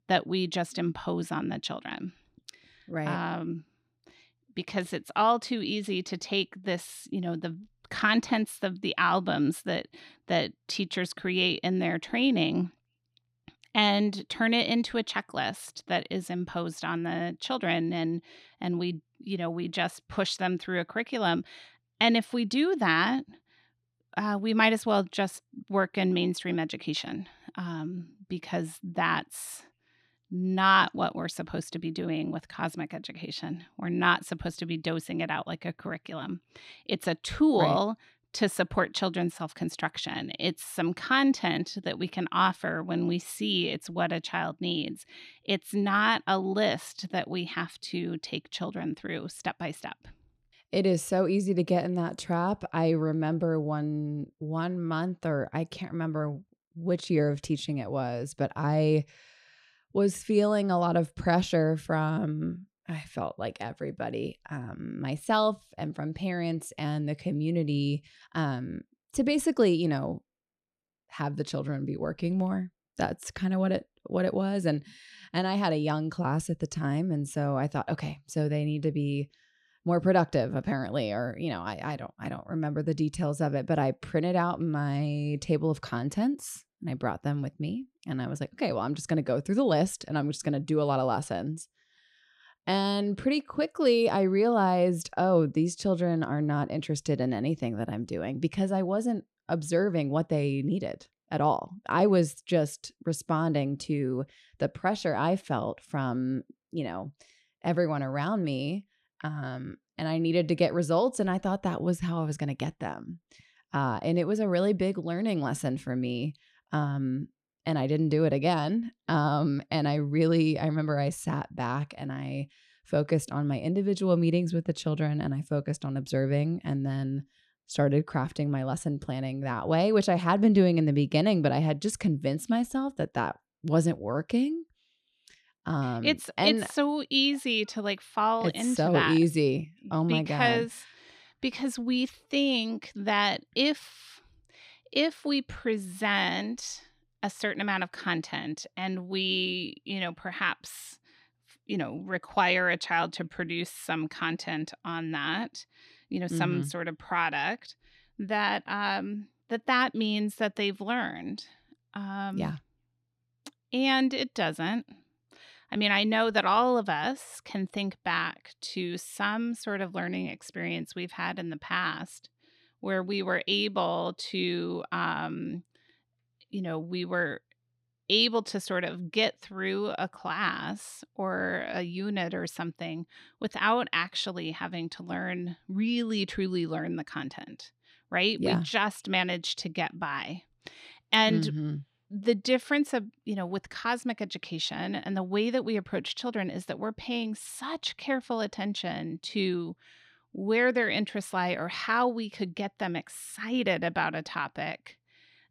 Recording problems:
none

